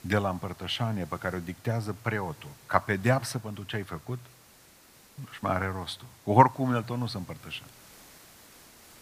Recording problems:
hiss; faint; throughout; 25 dB below the speech

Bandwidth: 15 kHz